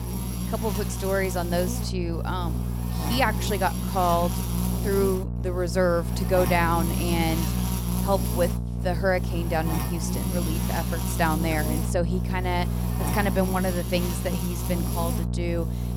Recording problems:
electrical hum; loud; throughout; 60 Hz, 8 dB below the speech

